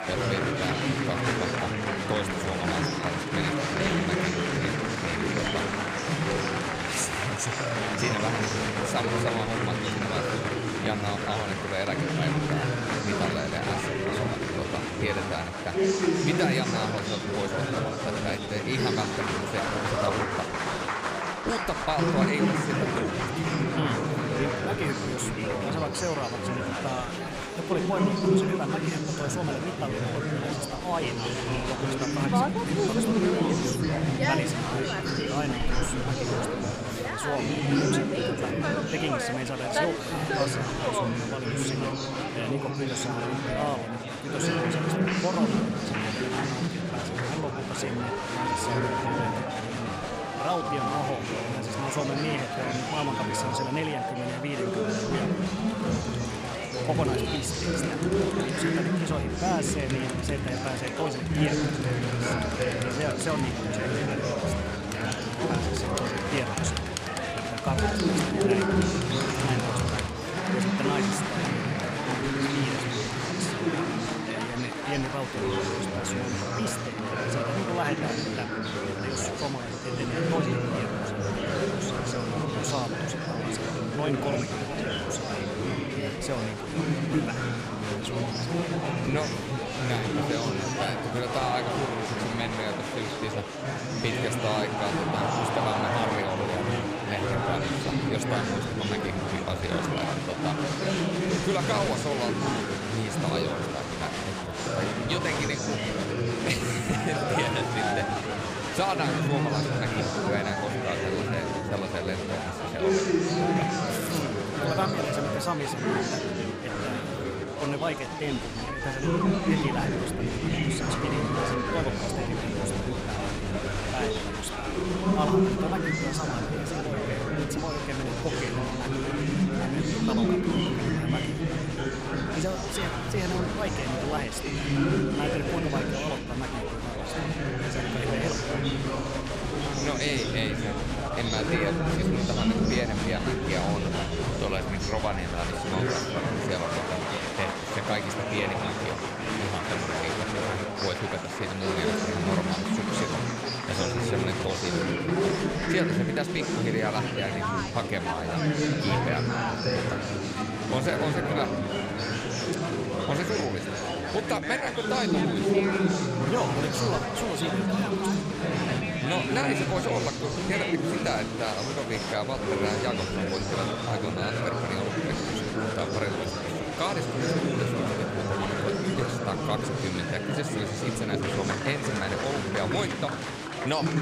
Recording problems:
murmuring crowd; very loud; throughout; 5 dB above the speech

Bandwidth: 15 kHz